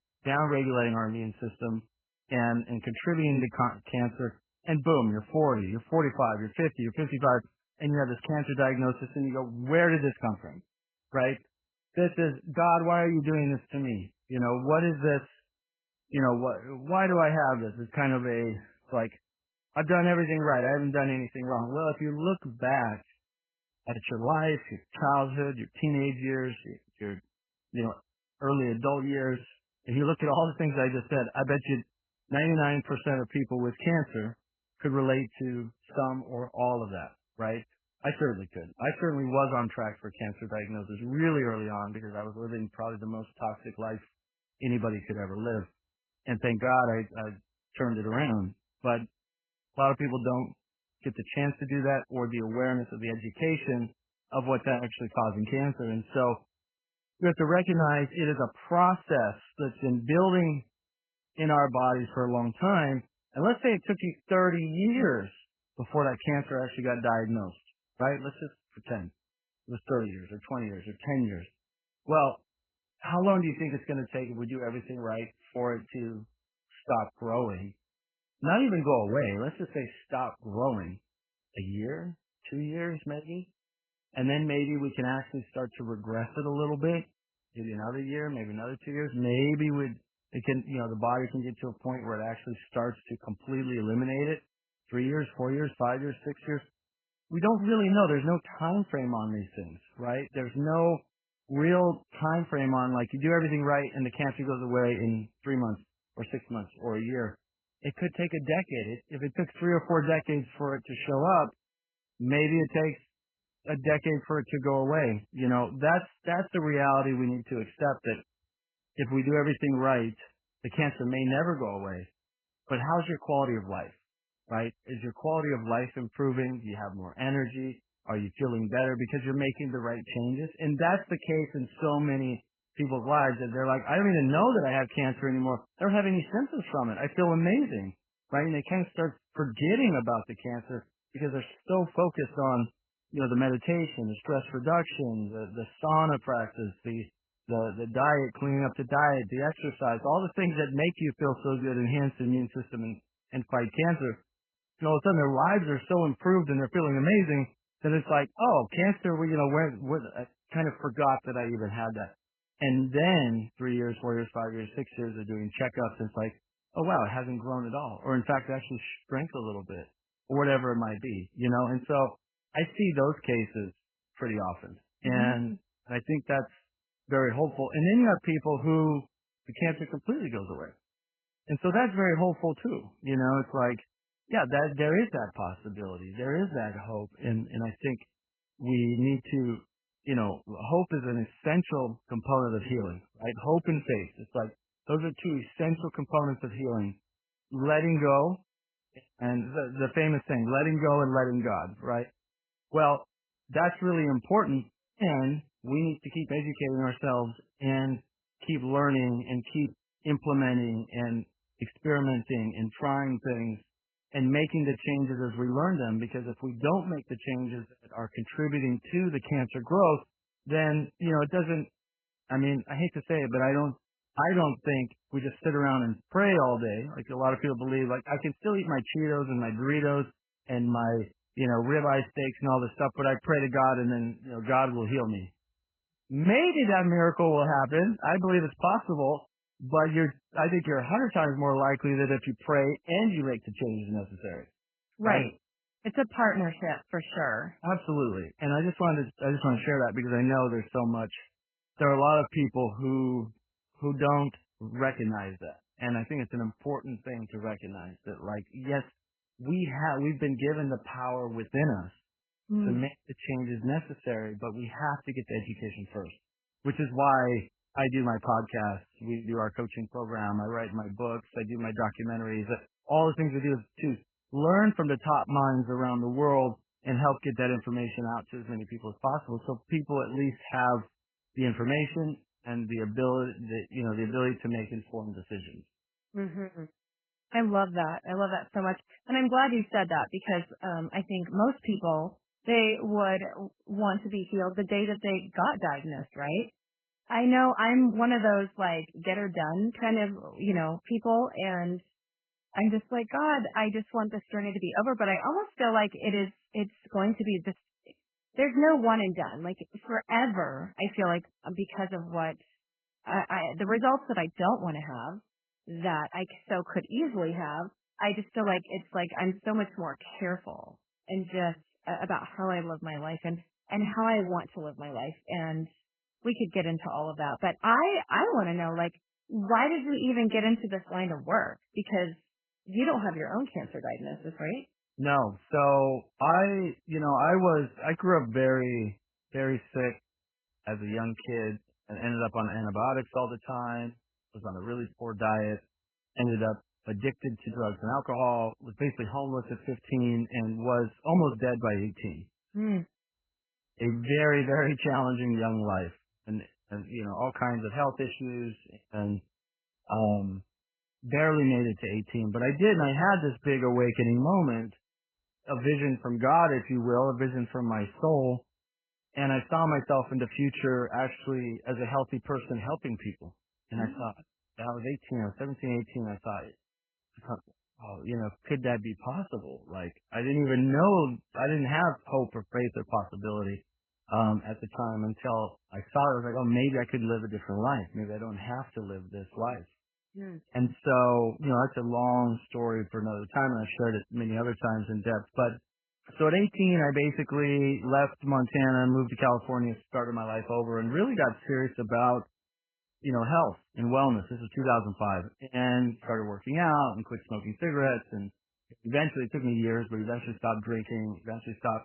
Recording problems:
garbled, watery; badly; nothing above 3 kHz
muffled; very slightly; fading above 3.5 kHz

